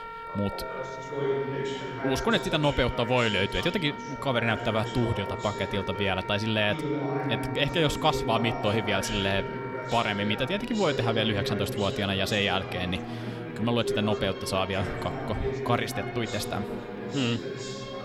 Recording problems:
background chatter; loud; throughout; 3 voices, 7 dB below the speech
background music; noticeable; throughout; 10 dB below the speech

